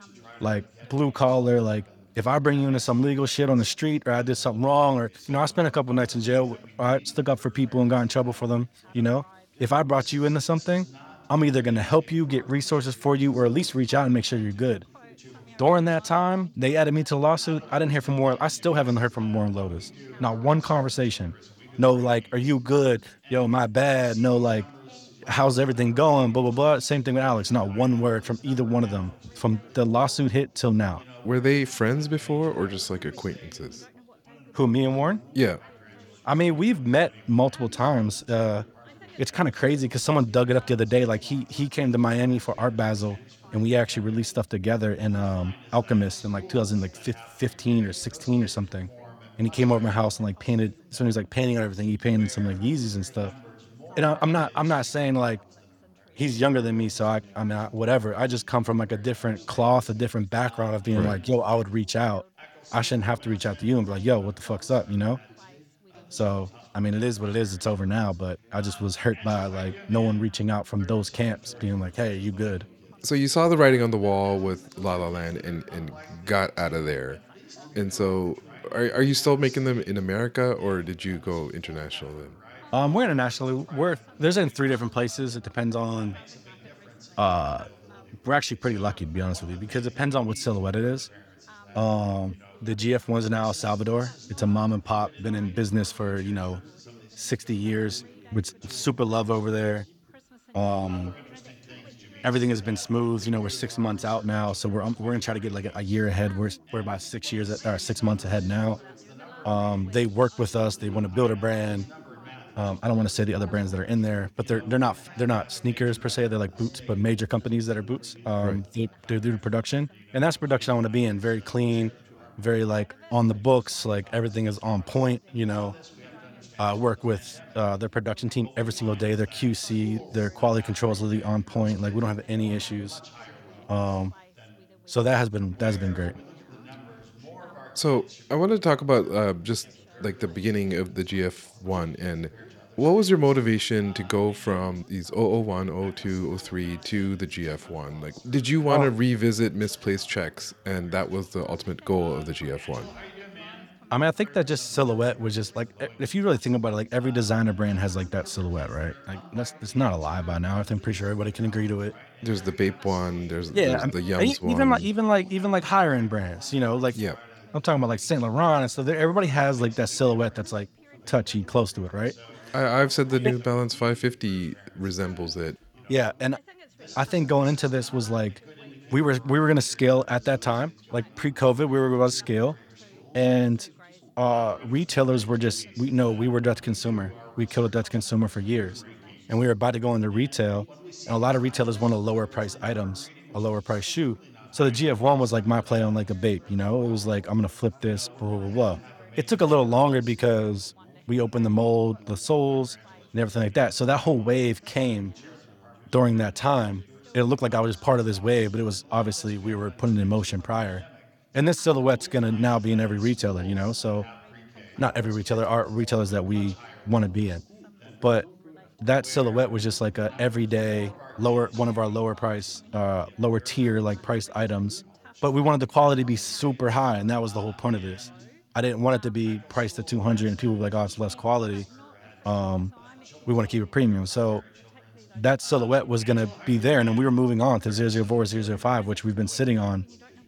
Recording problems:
background chatter; faint; throughout; 3 voices, 25 dB below the speech

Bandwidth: 18.5 kHz